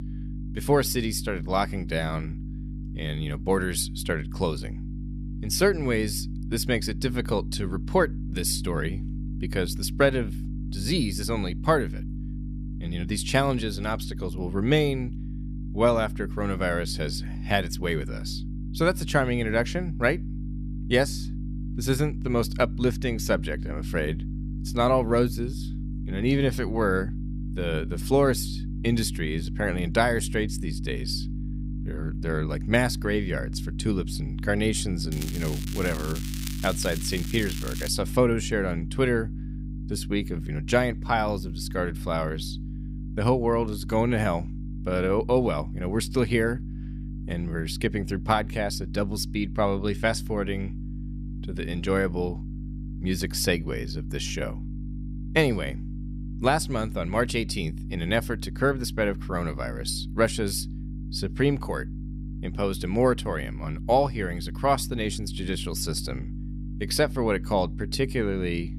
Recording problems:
electrical hum; noticeable; throughout; 50 Hz, 15 dB below the speech
crackling; noticeable; from 35 to 38 s; 10 dB below the speech

